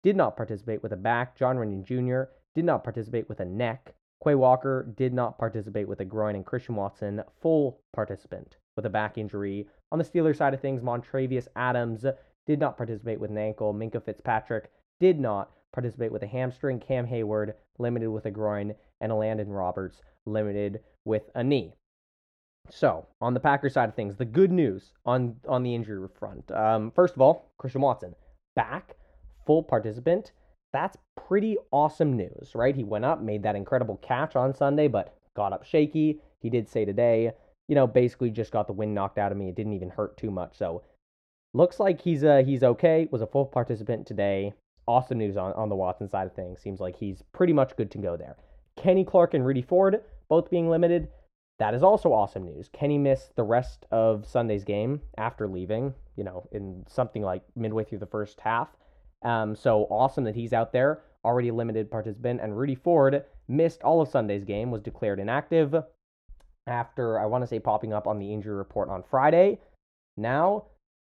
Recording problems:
muffled; very; fading above 2 kHz

